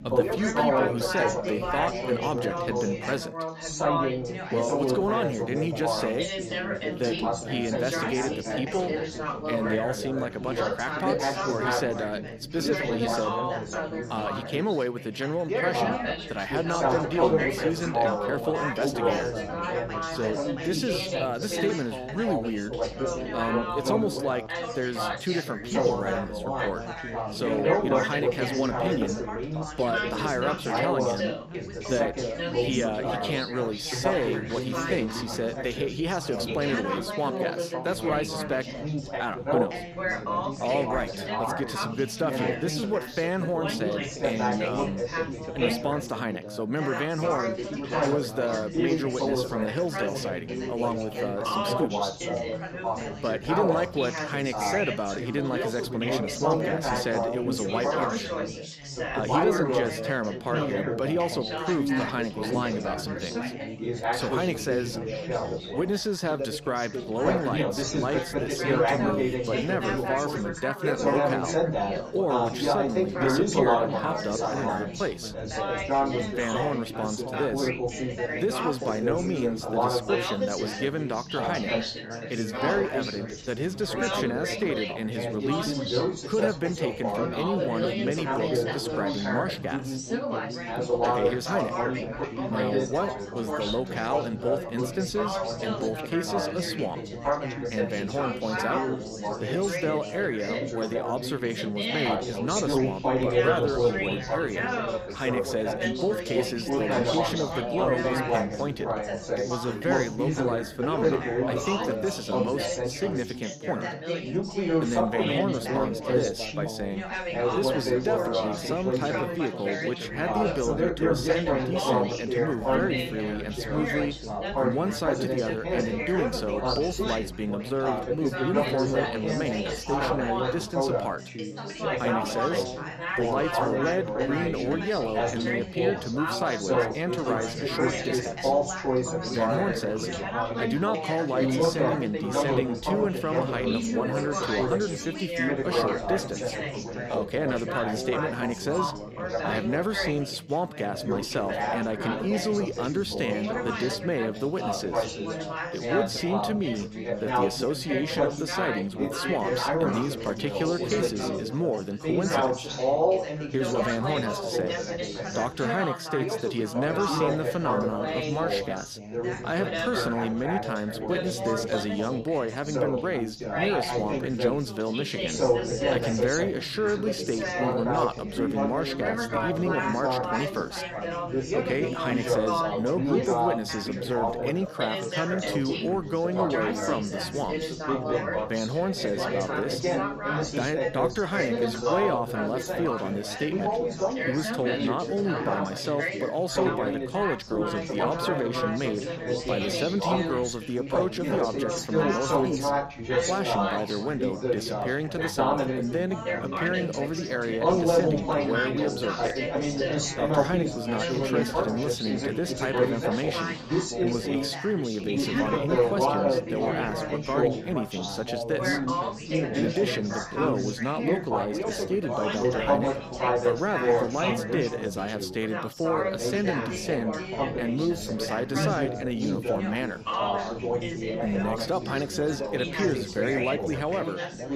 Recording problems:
chatter from many people; very loud; throughout; 1 dB above the speech

